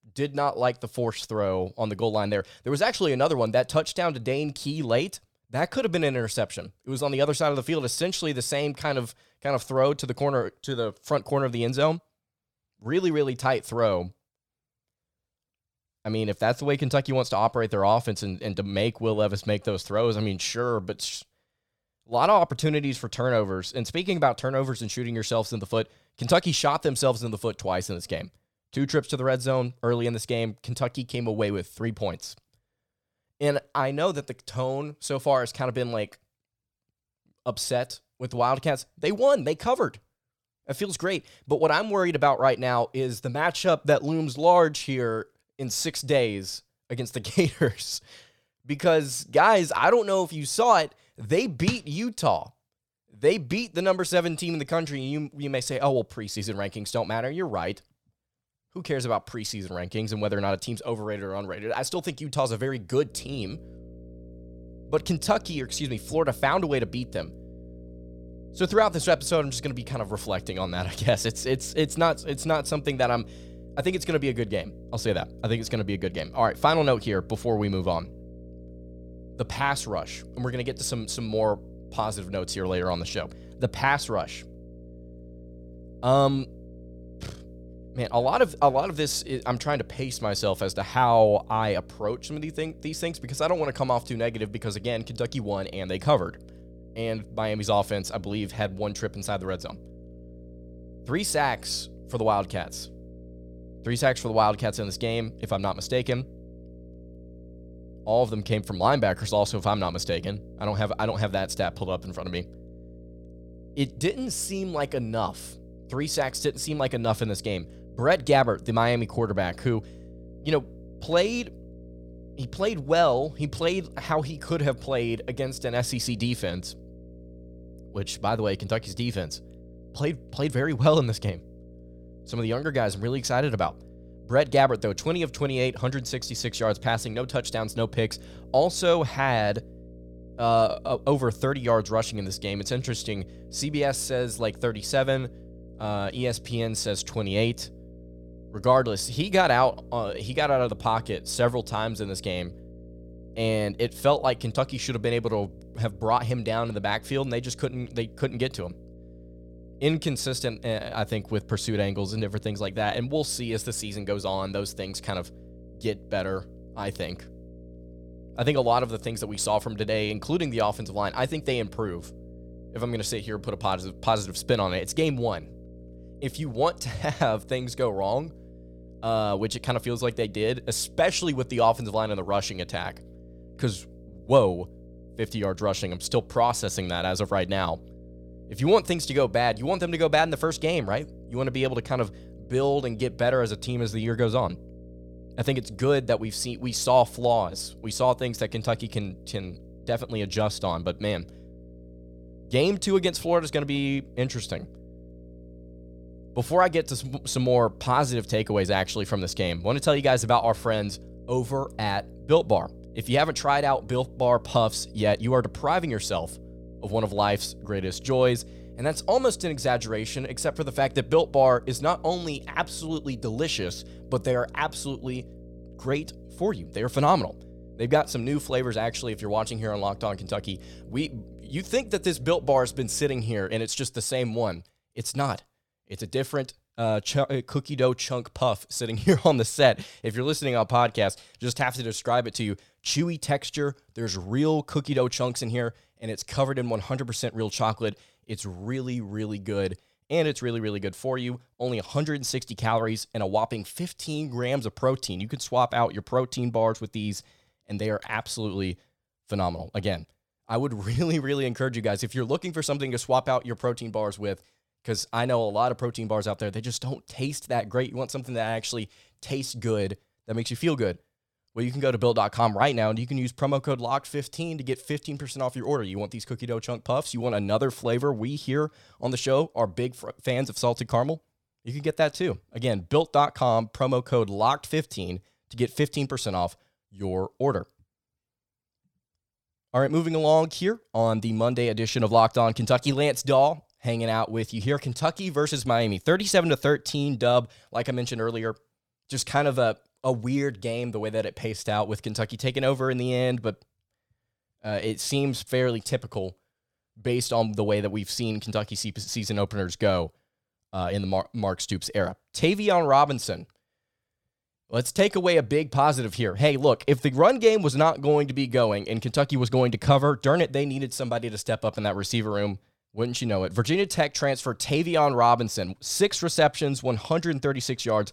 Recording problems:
electrical hum; faint; from 1:03 to 3:53; 60 Hz, 25 dB below the speech

